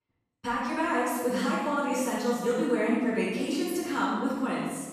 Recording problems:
room echo; strong; dies away in 1.3 s
off-mic speech; far

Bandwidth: 14 kHz